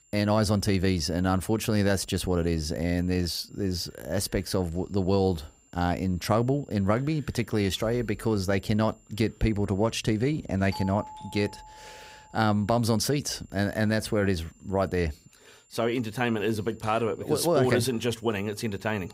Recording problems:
high-pitched whine; faint; throughout; 7.5 kHz, 30 dB below the speech
doorbell; faint; from 11 to 12 s; peak 10 dB below the speech

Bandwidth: 15.5 kHz